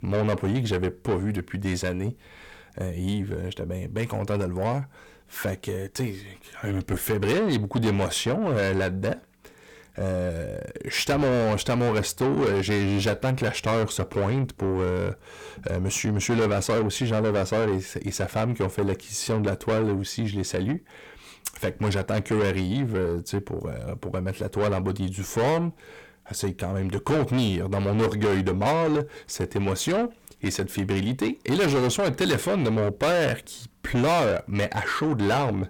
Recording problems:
distortion; heavy; 6 dB below the speech

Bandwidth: 18.5 kHz